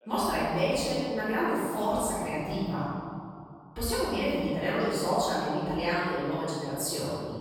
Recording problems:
room echo; strong; dies away in 2.1 s
off-mic speech; far
voice in the background; faint; throughout; 30 dB below the speech

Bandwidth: 17 kHz